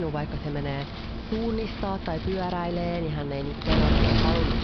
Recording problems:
high frequencies cut off; noticeable; nothing above 5.5 kHz
wind noise on the microphone; heavy; 1 dB below the speech
murmuring crowd; noticeable; throughout; 20 dB below the speech
abrupt cut into speech; at the start

